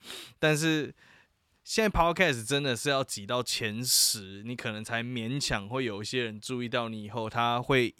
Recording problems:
none

